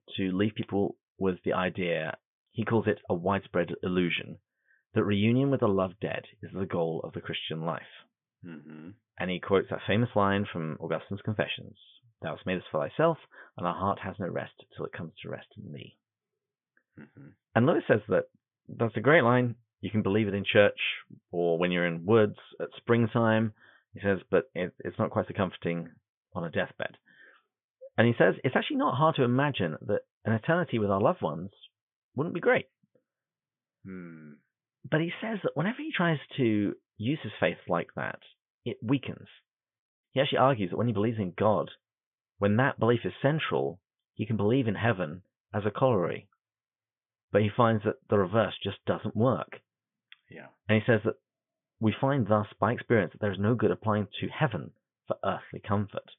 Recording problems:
high frequencies cut off; severe; nothing above 3.5 kHz

